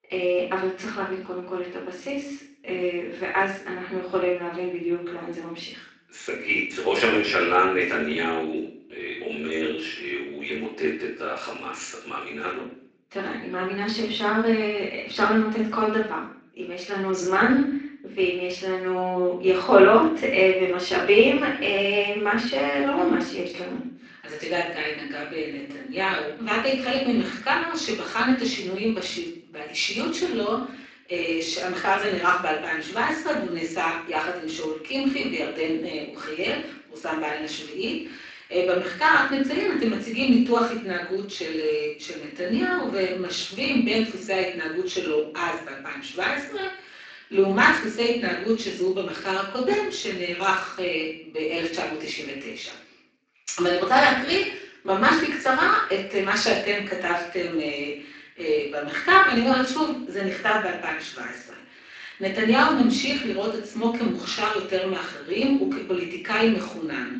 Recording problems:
off-mic speech; far
room echo; noticeable; dies away in 0.6 s
thin; somewhat; fading below 250 Hz
garbled, watery; slightly; nothing above 7.5 kHz

